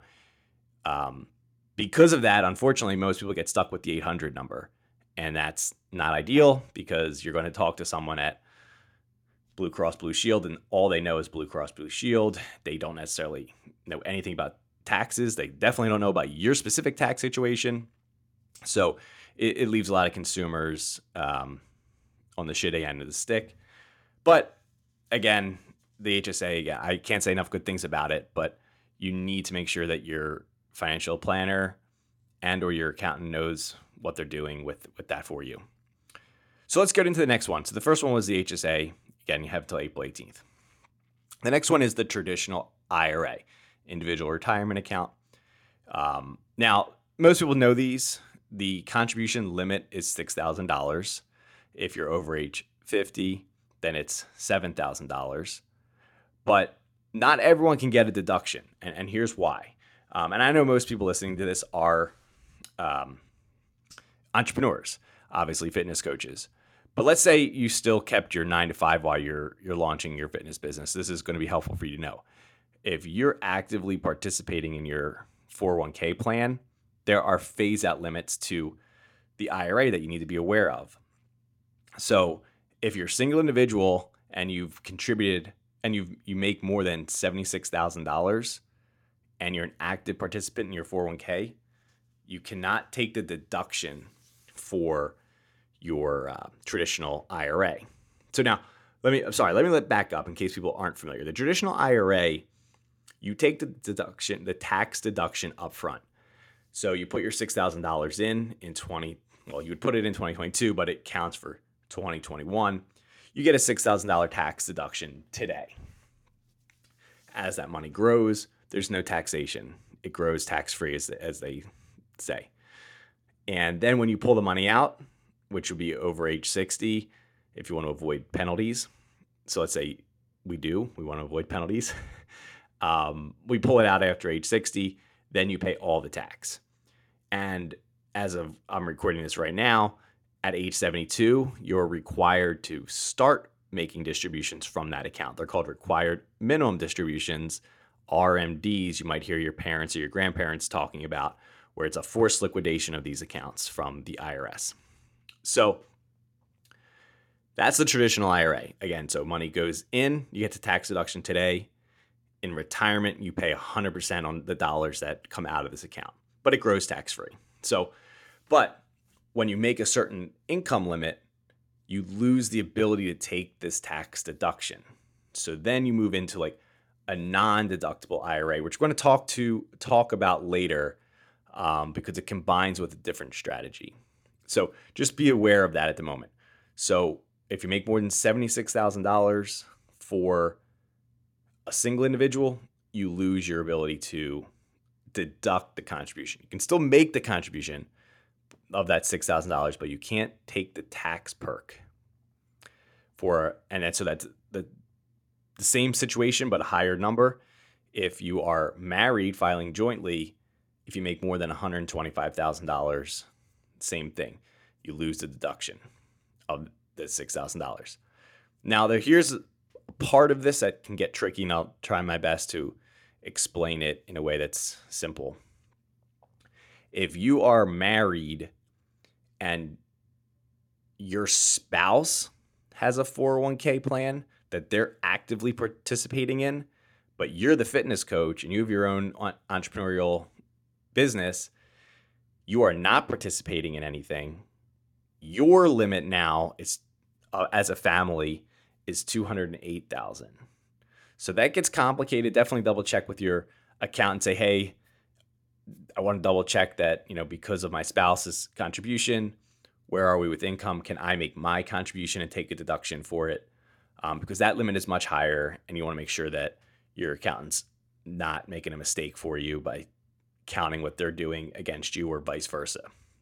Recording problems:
none

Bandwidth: 17 kHz